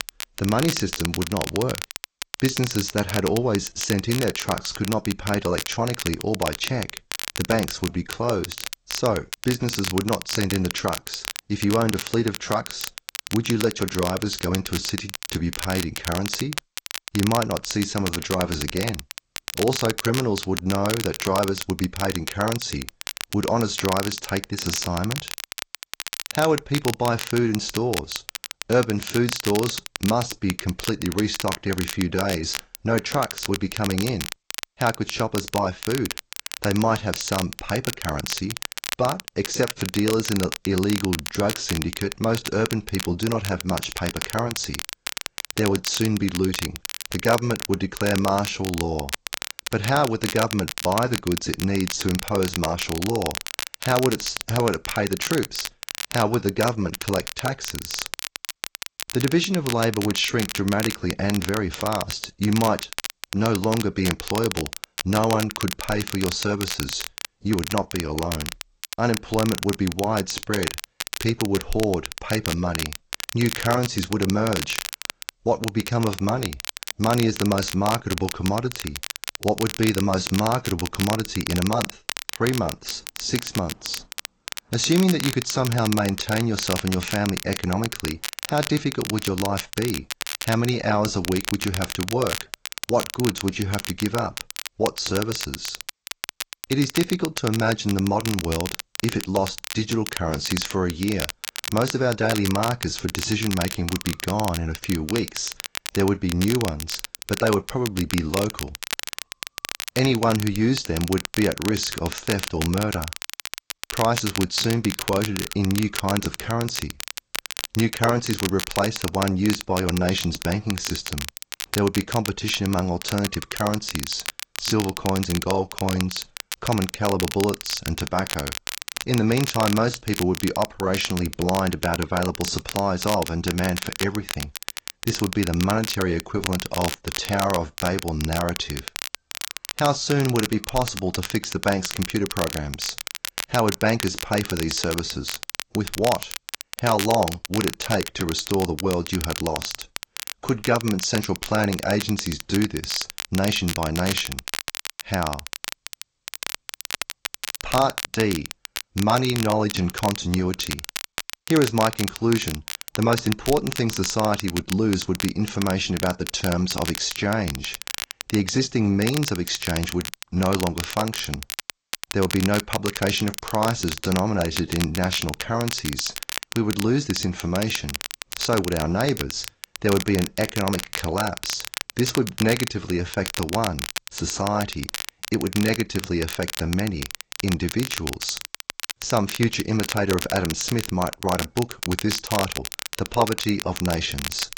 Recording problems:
garbled, watery; slightly; nothing above 7.5 kHz
crackle, like an old record; loud; 7 dB below the speech

